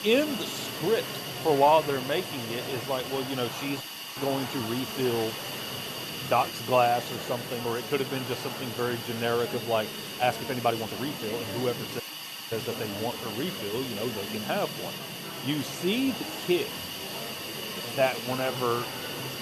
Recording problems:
hiss; loud; throughout; 6 dB below the speech
murmuring crowd; noticeable; throughout; 10 dB below the speech
uneven, jittery; strongly; from 1.5 to 19 s
audio cutting out; at 4 s and at 12 s for 0.5 s

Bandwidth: 13.5 kHz